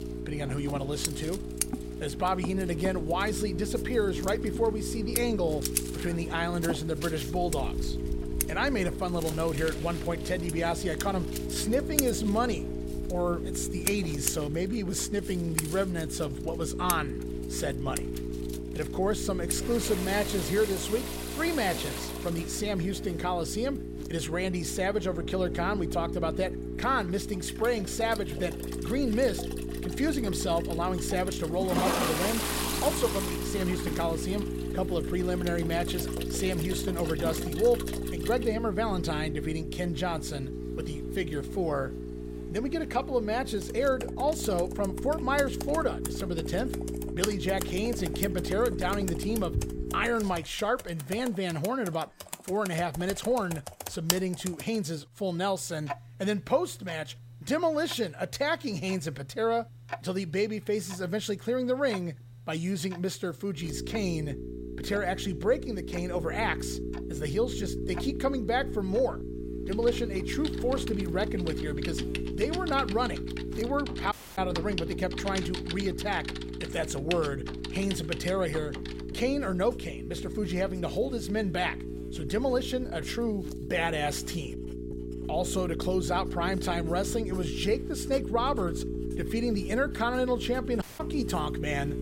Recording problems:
electrical hum; loud; until 50 s and from 1:04 on; 60 Hz, 9 dB below the speech
household noises; loud; throughout; 7 dB below the speech
audio cutting out; at 1:14 and at 1:31

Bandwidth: 16 kHz